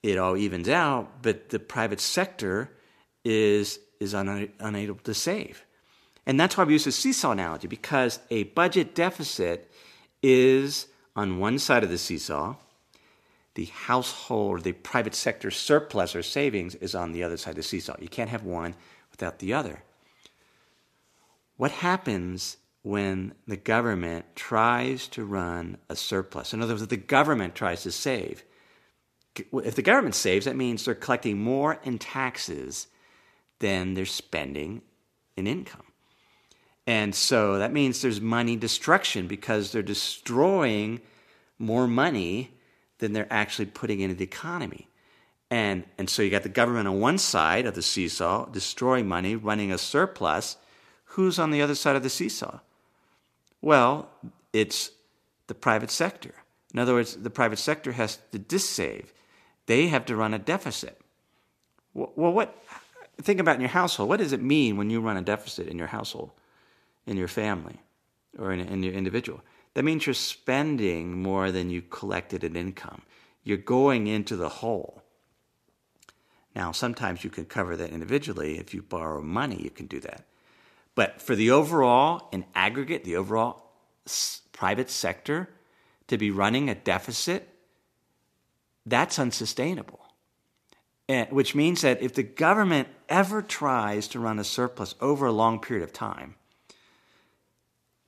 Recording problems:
none

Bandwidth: 14.5 kHz